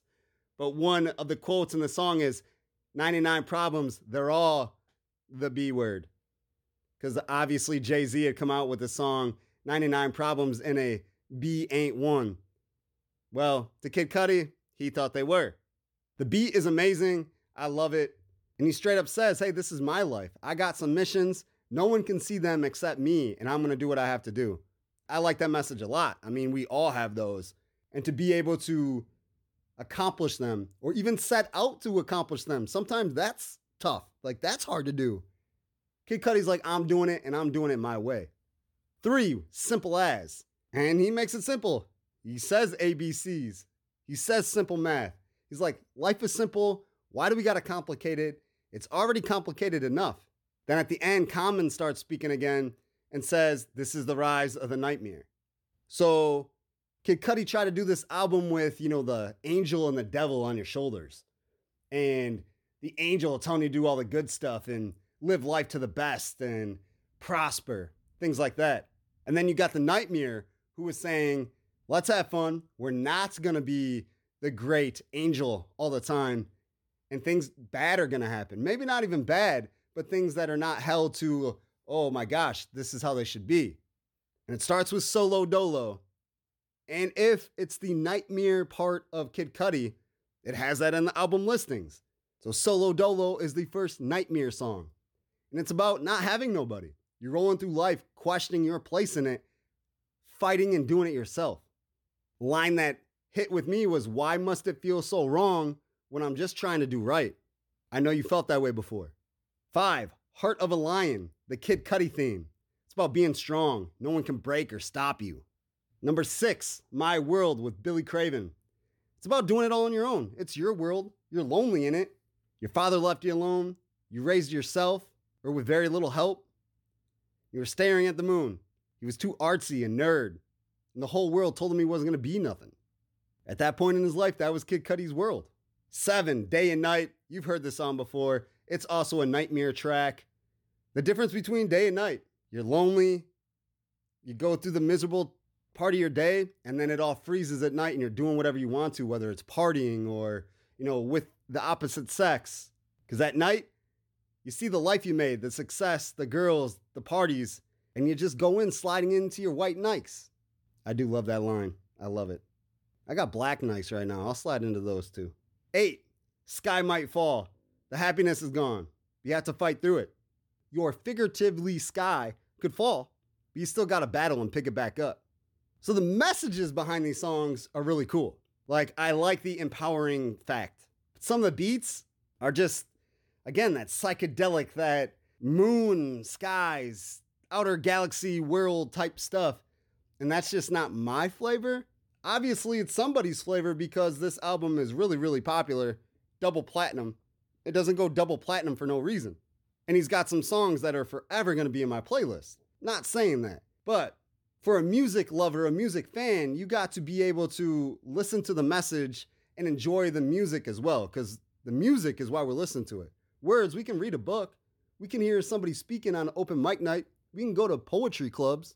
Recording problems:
none

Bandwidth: 18 kHz